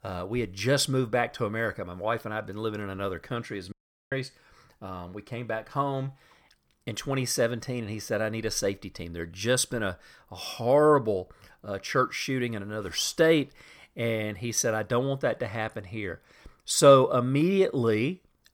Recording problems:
audio cutting out; at 3.5 s

